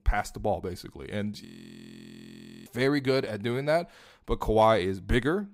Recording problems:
audio freezing; at 1.5 s for 1 s

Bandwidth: 15.5 kHz